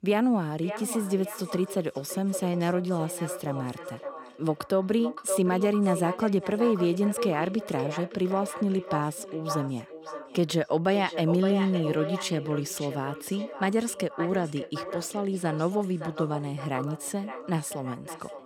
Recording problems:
echo of what is said; strong; throughout; 570 ms later, 9 dB below the speech

